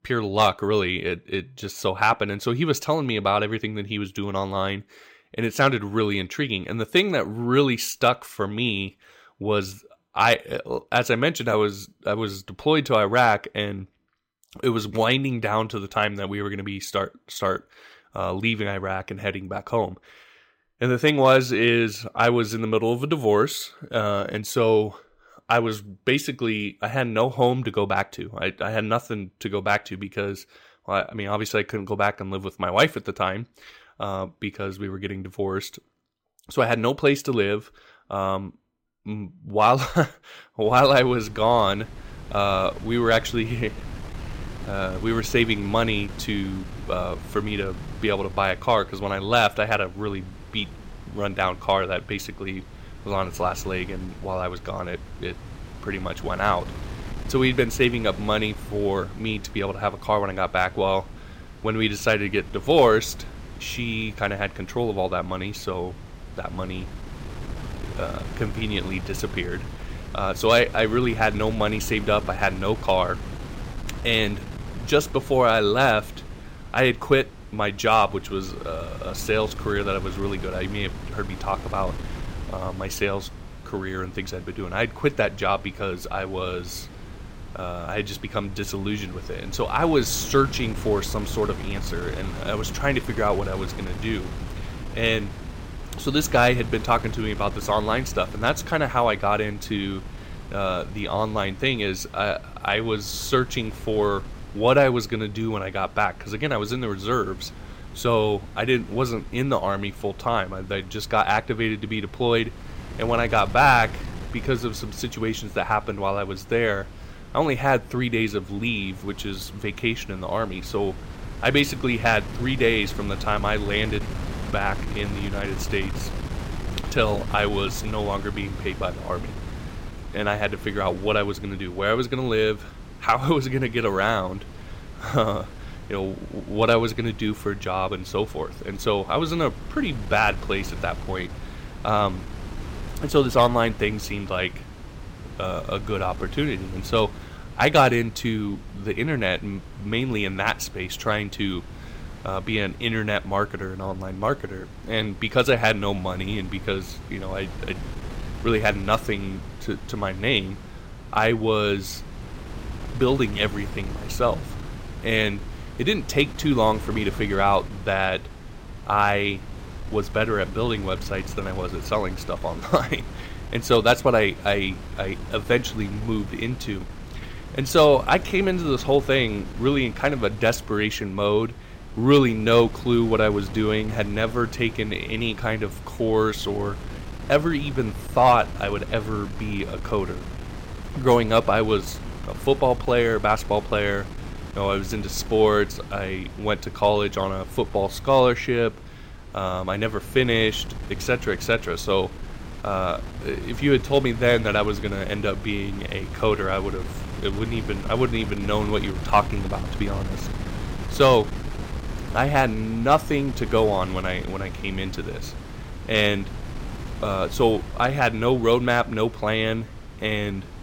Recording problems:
wind noise on the microphone; occasional gusts; from 41 s on; 20 dB below the speech

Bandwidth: 16 kHz